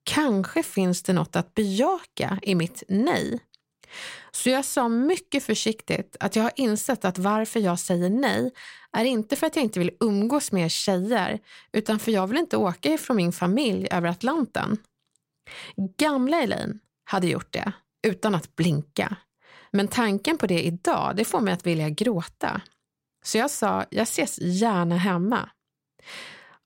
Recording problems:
none

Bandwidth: 16 kHz